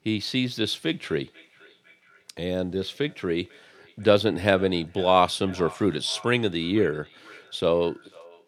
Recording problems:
echo of what is said; faint; throughout; 500 ms later, 25 dB below the speech

